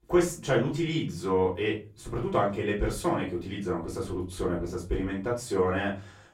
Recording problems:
off-mic speech; far
room echo; slight; dies away in 0.3 s

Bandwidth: 16 kHz